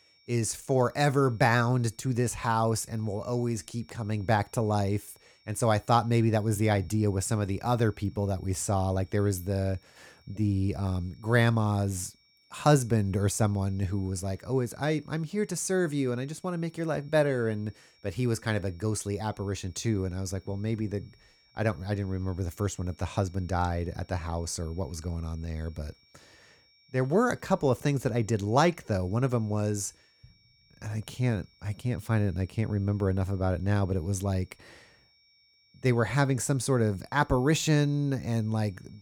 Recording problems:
high-pitched whine; faint; throughout; 5.5 kHz, 30 dB below the speech

